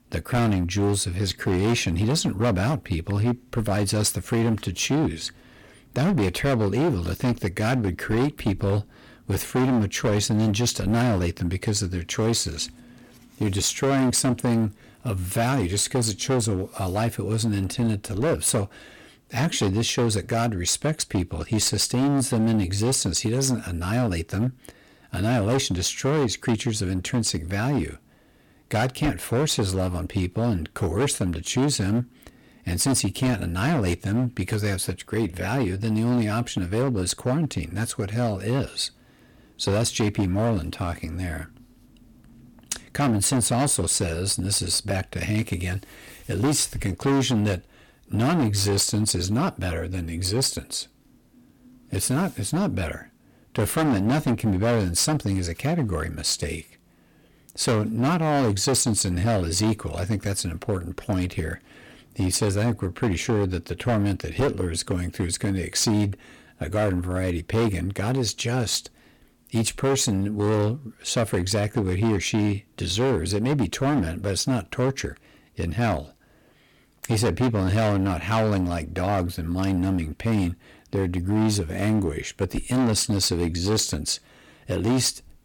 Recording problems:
distortion; heavy; 12% of the sound clipped

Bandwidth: 17.5 kHz